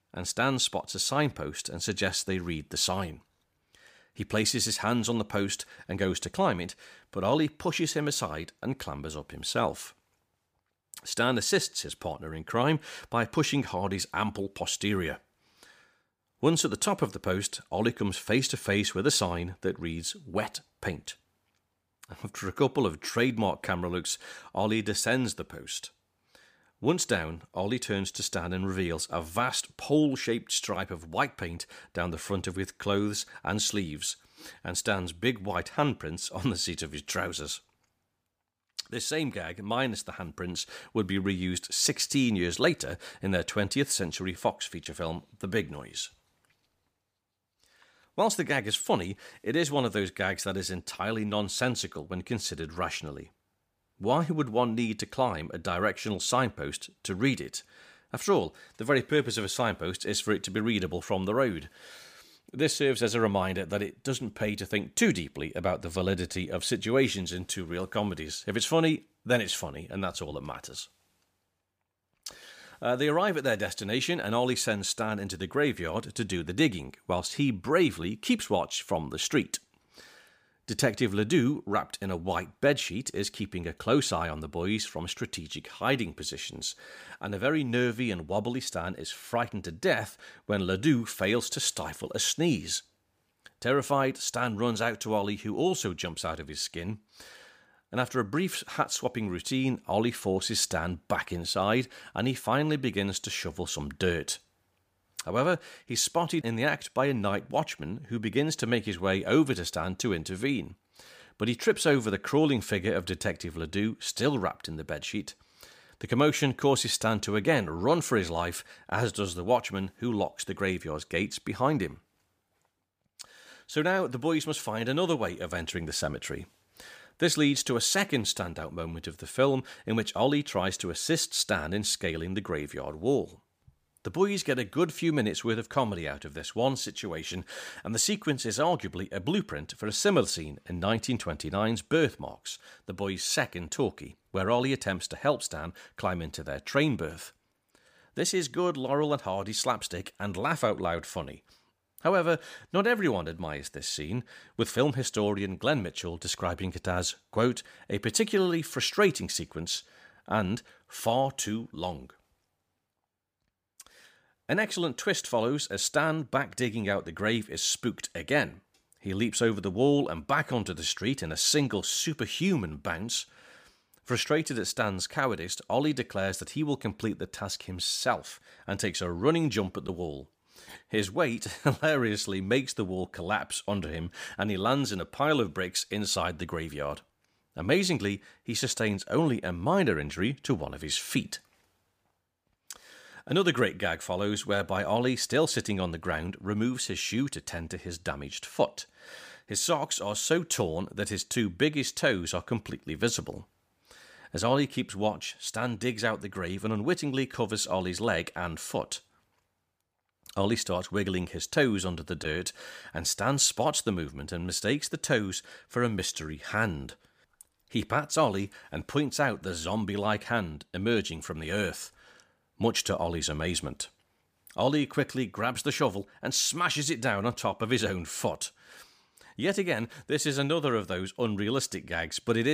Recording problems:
abrupt cut into speech; at the end

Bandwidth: 15 kHz